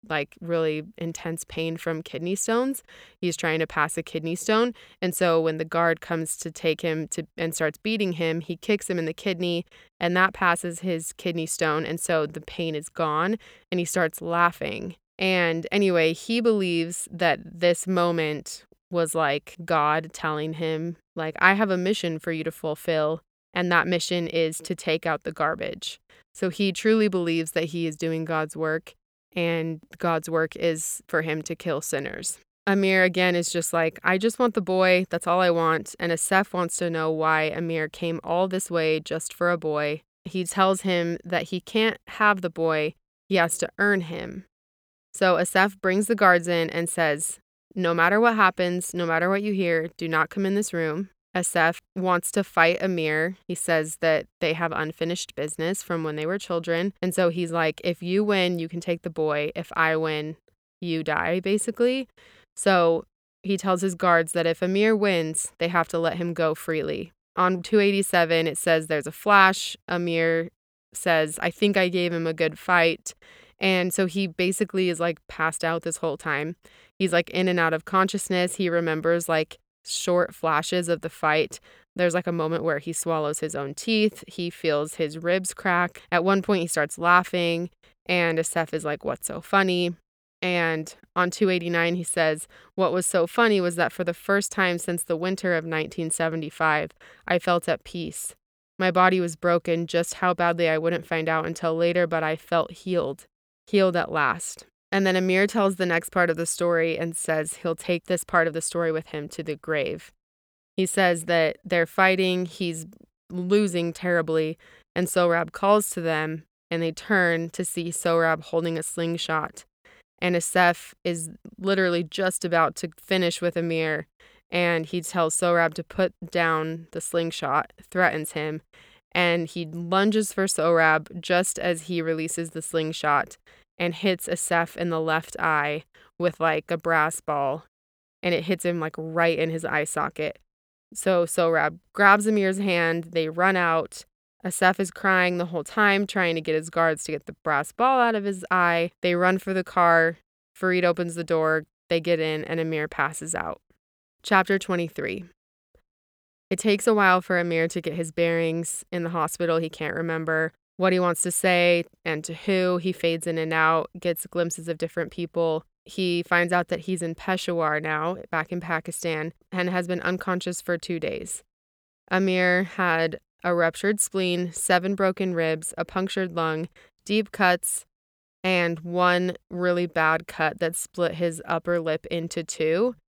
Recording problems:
none

